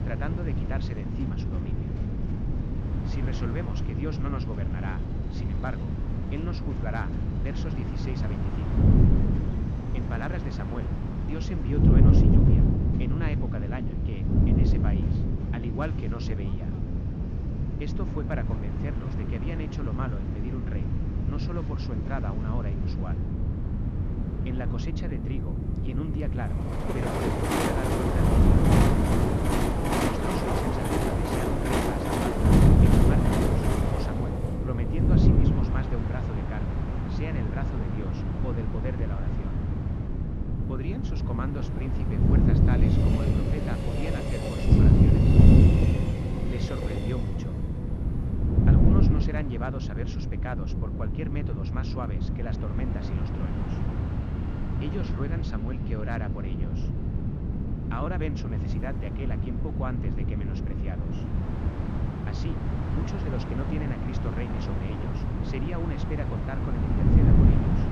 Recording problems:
train or aircraft noise; very loud; throughout; 3 dB above the speech
wind noise on the microphone; heavy; 3 dB above the speech
phone ringing; noticeable; from 26 to 34 s; peak 9 dB below the speech

